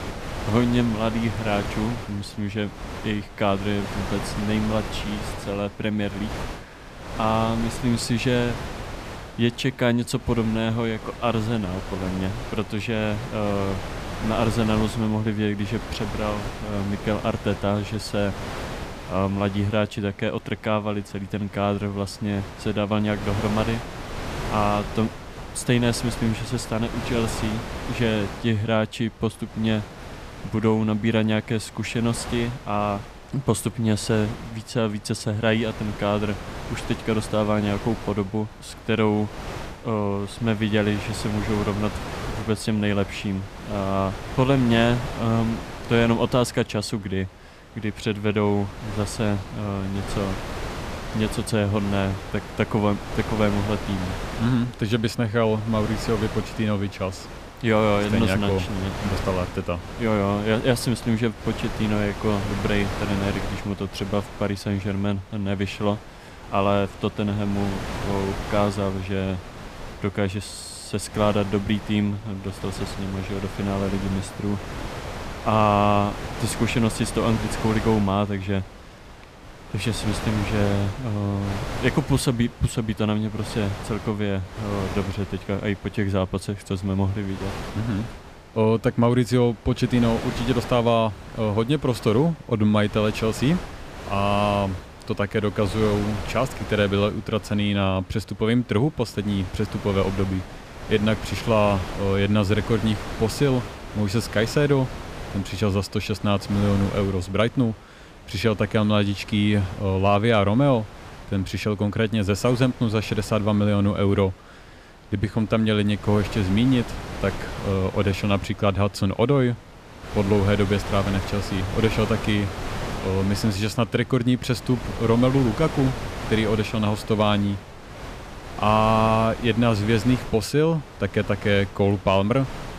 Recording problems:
wind noise on the microphone; heavy; 9 dB below the speech

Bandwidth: 14.5 kHz